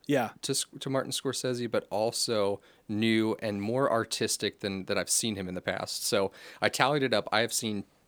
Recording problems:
none

